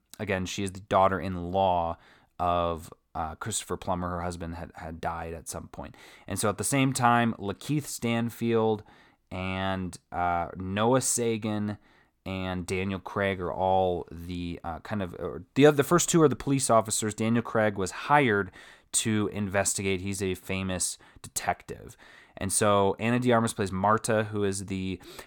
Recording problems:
none

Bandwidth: 18 kHz